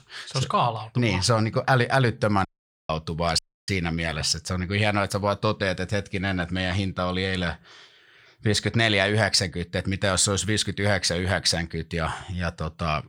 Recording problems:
audio cutting out; at 2.5 s and at 3.5 s

